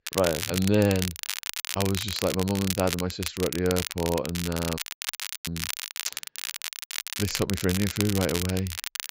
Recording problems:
high frequencies cut off; noticeable; nothing above 8 kHz
crackle, like an old record; loud; 4 dB below the speech
audio cutting out; at 5 s for 0.5 s

